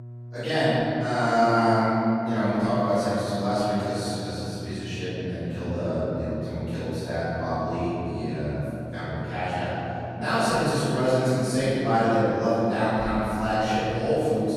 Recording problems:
room echo; strong; dies away in 3 s
off-mic speech; far
electrical hum; faint; throughout; 60 Hz, 25 dB below the speech

